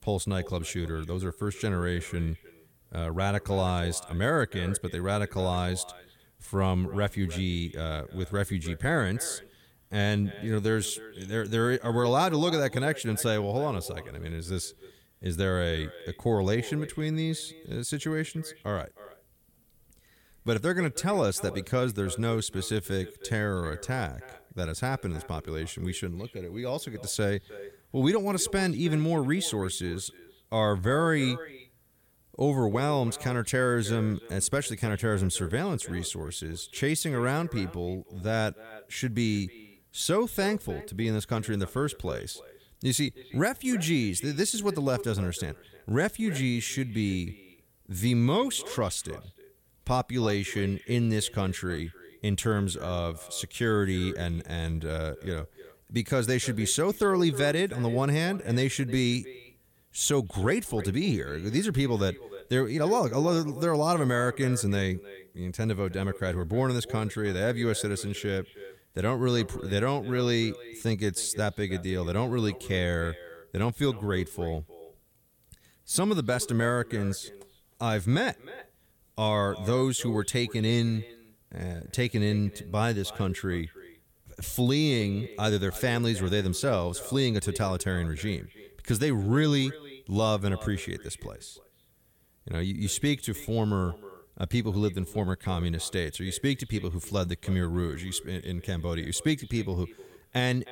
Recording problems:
echo of what is said; noticeable; throughout; 310 ms later, 20 dB below the speech

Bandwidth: 17.5 kHz